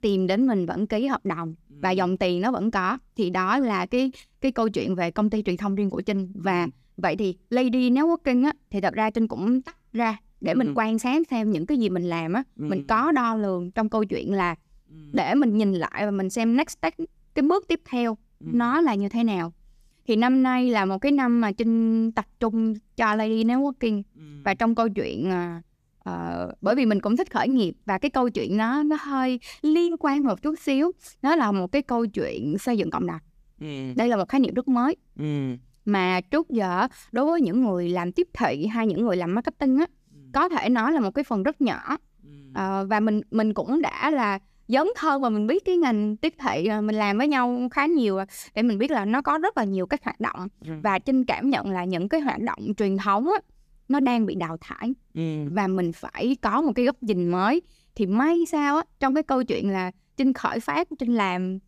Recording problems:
none

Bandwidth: 14.5 kHz